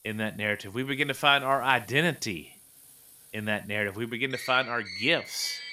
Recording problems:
traffic noise; noticeable; throughout; 15 dB below the speech

